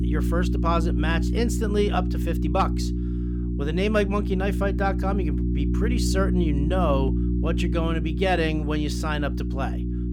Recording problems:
electrical hum; loud; throughout; 60 Hz, 8 dB below the speech

